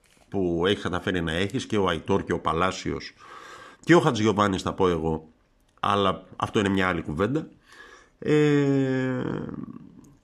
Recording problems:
none

